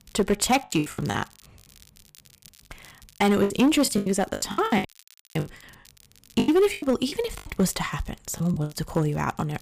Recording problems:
distortion; slight; 4% of the sound clipped
crackle, like an old record; faint; 25 dB below the speech
choppy; very; 18% of the speech affected
audio cutting out; at 5 s for 0.5 s

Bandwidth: 15 kHz